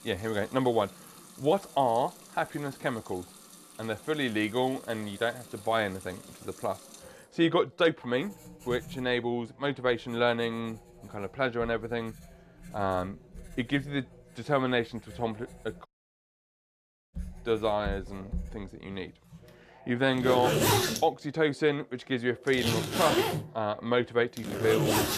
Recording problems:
household noises; loud; throughout; 1 dB below the speech
background chatter; faint; throughout; 2 voices, 25 dB below the speech
audio cutting out; at 16 s for 1.5 s

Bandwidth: 14.5 kHz